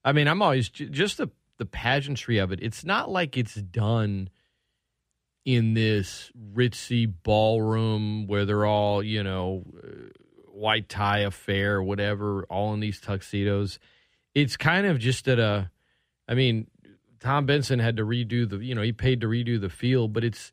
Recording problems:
none

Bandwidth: 15.5 kHz